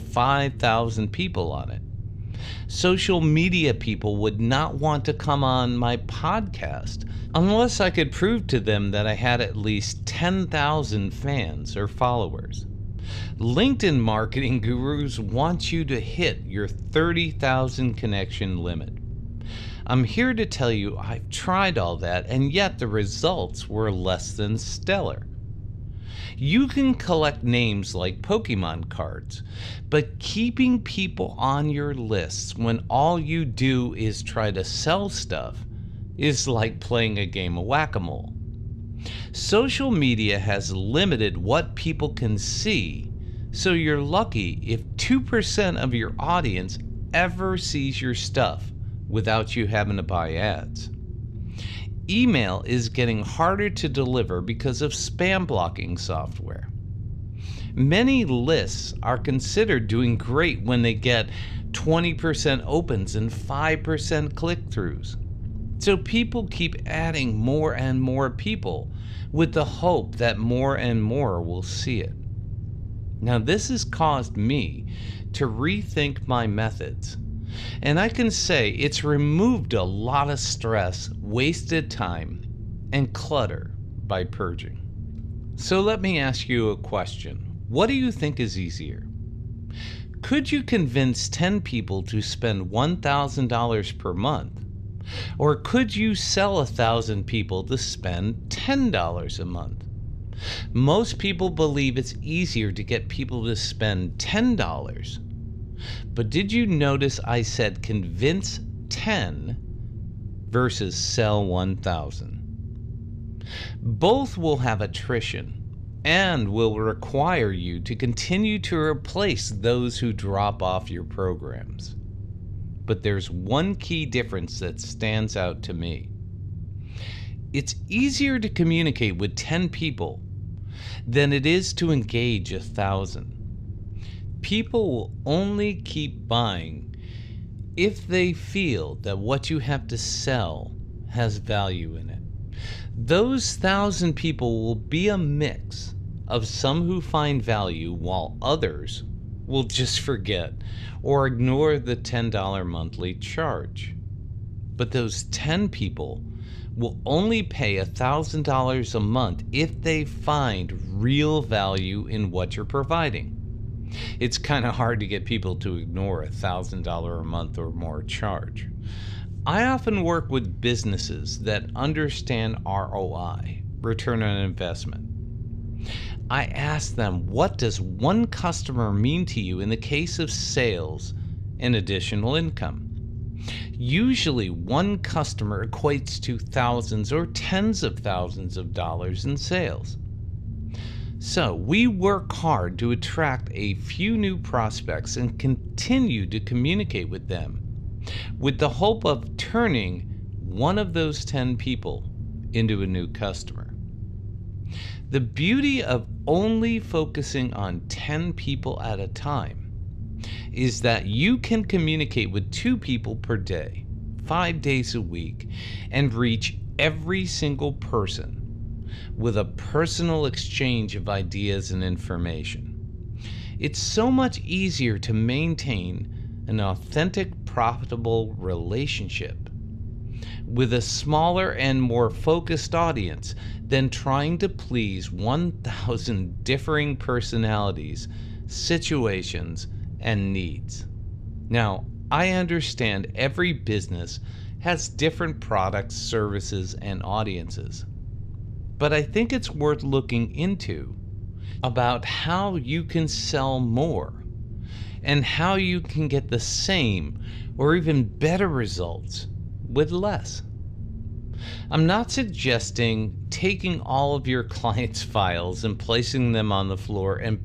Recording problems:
low rumble; faint; throughout; 20 dB below the speech

